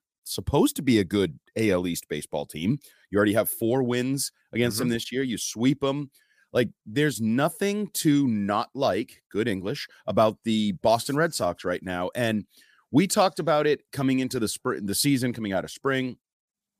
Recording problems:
none

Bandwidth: 15 kHz